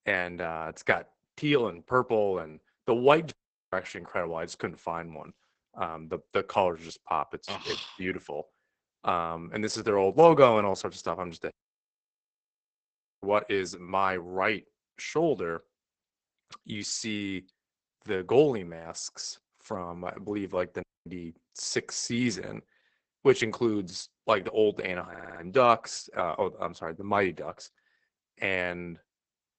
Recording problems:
garbled, watery; badly; nothing above 8 kHz
audio cutting out; at 3.5 s, at 12 s for 1.5 s and at 21 s
audio stuttering; at 25 s

